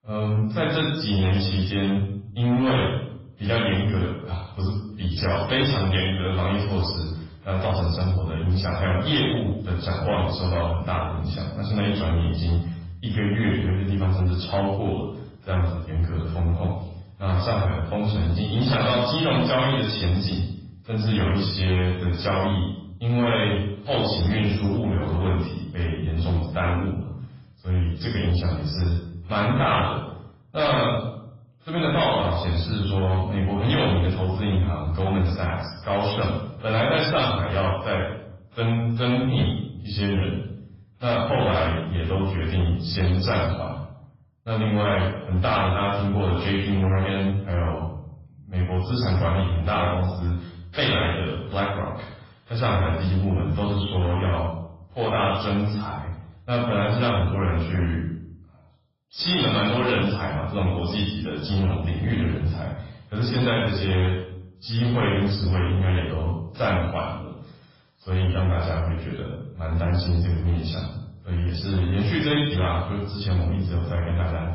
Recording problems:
off-mic speech; far
garbled, watery; badly; nothing above 5.5 kHz
room echo; noticeable; dies away in 0.6 s
distortion; slight; 11% of the sound clipped

